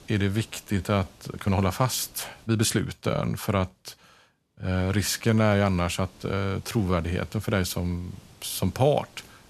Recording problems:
hiss; faint; until 2.5 s and from 5 s on; 25 dB below the speech
uneven, jittery; strongly; from 0.5 to 8.5 s

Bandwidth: 13.5 kHz